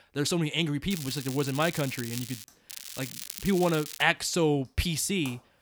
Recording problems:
crackling; noticeable; from 1 to 2.5 s and from 2.5 to 4 s; 10 dB below the speech
household noises; faint; throughout; 25 dB below the speech

